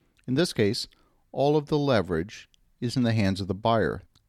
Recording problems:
none

